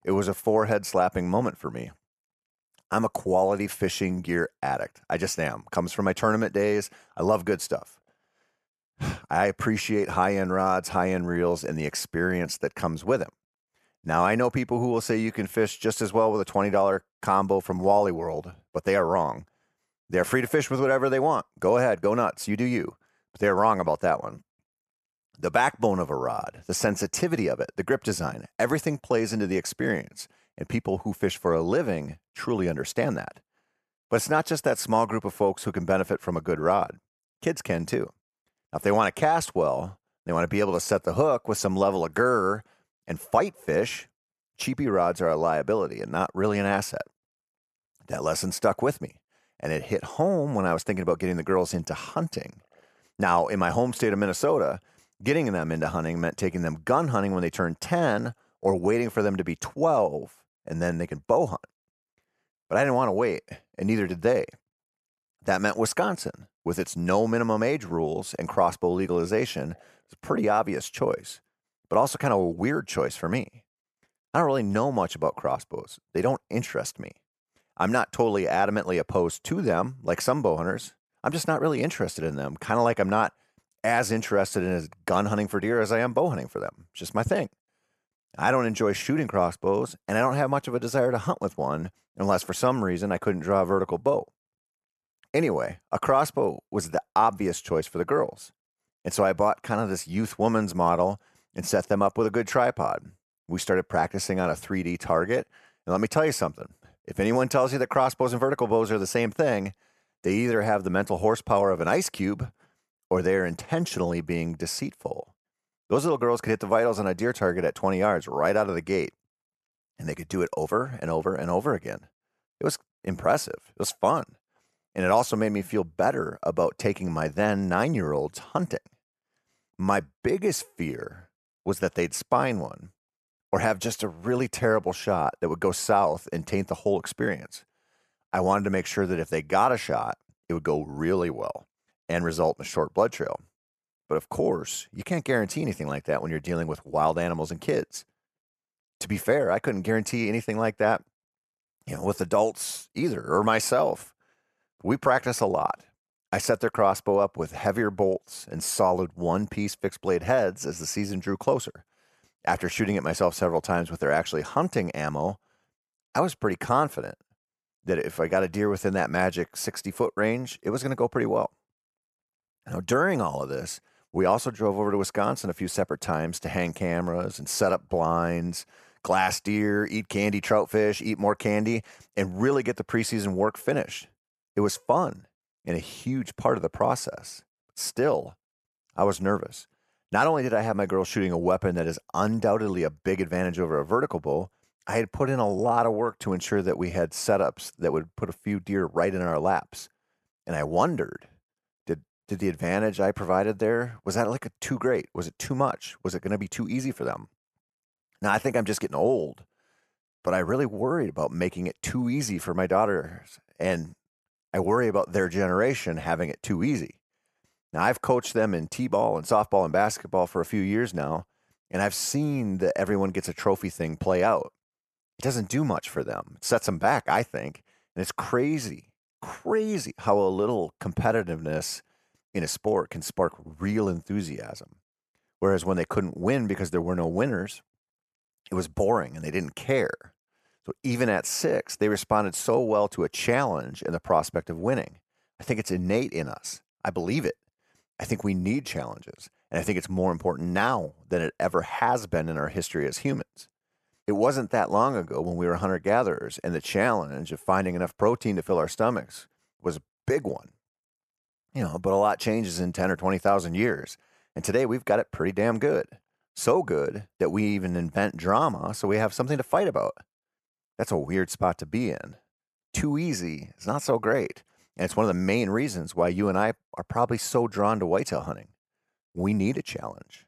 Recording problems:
none

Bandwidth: 13.5 kHz